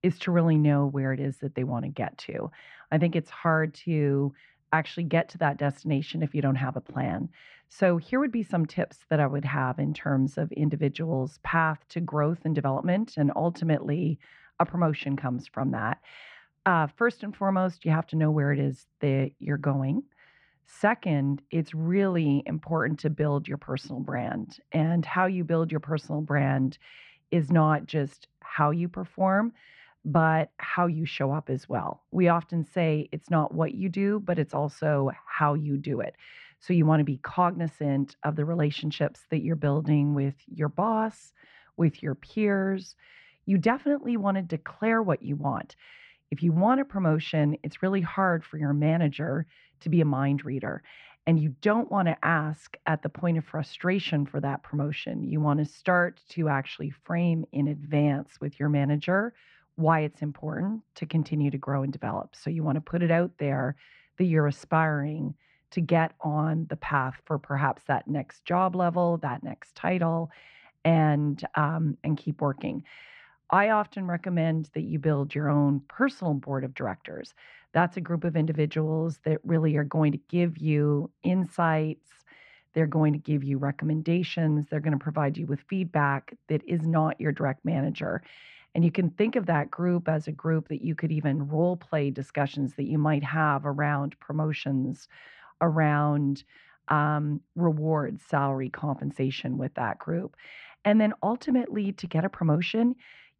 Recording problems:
muffled; very; fading above 2 kHz

